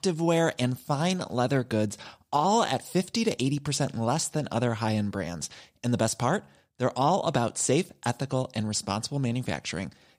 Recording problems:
none

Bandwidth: 15.5 kHz